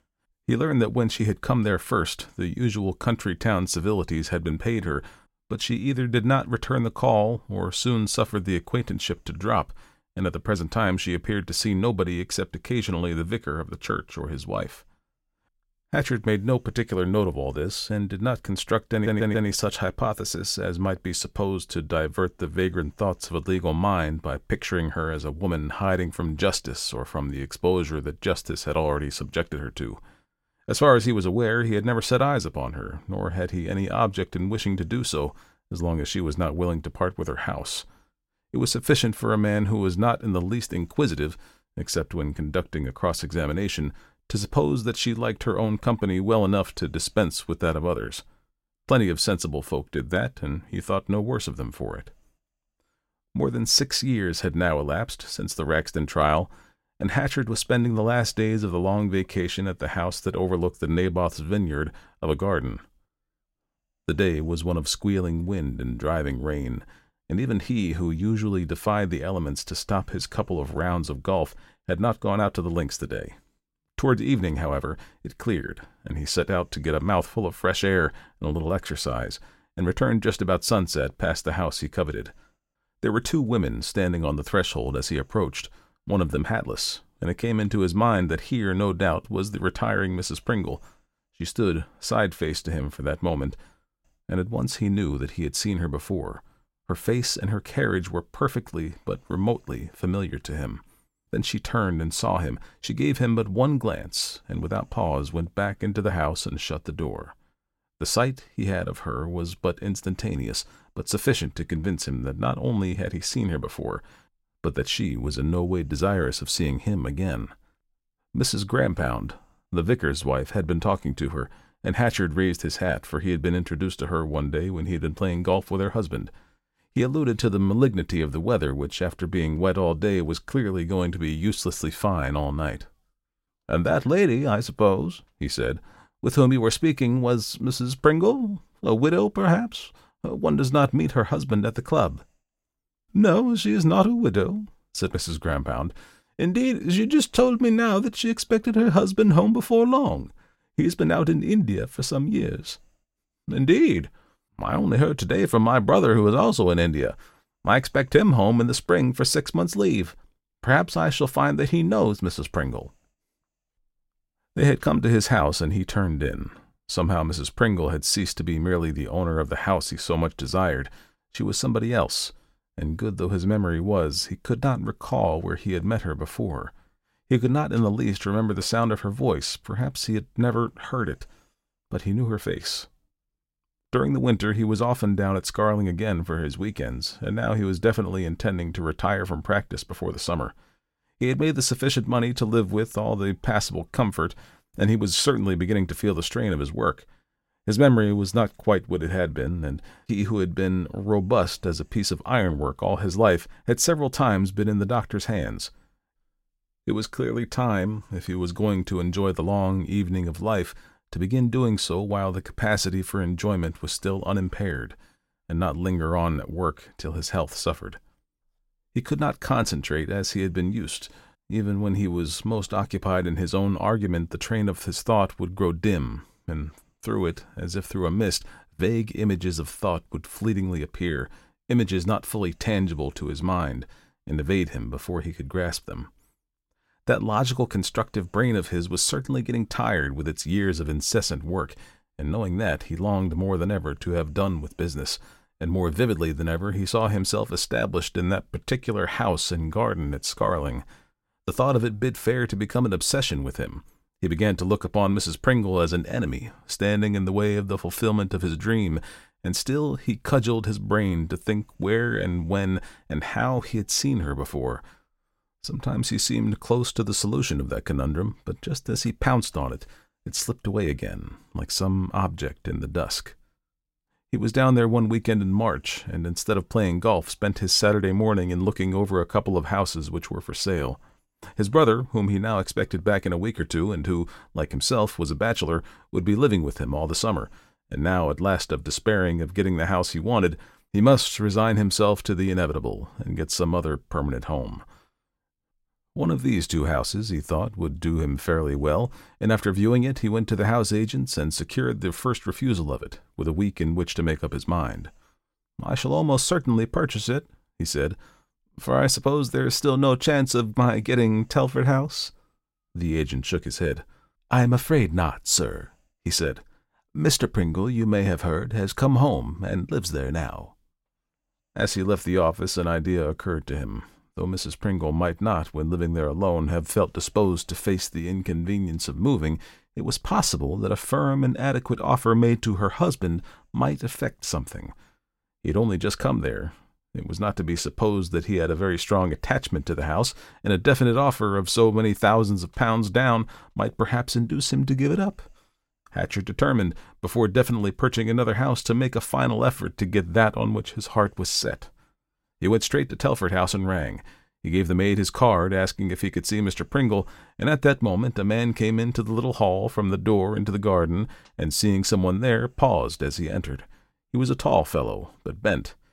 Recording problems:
audio stuttering; at 19 s

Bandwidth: 16 kHz